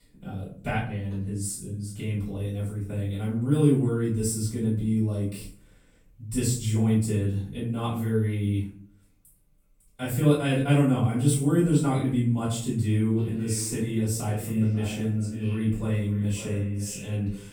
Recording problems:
off-mic speech; far
echo of what is said; noticeable; from 13 s on; 550 ms later, 15 dB below the speech
room echo; noticeable; dies away in 0.5 s

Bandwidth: 17.5 kHz